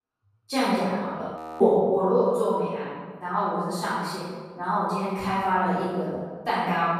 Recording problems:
room echo; strong; dies away in 1.3 s
off-mic speech; far
audio freezing; at 1.5 s

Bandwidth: 14.5 kHz